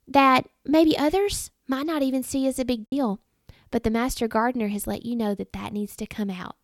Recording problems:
choppy; occasionally; 1% of the speech affected

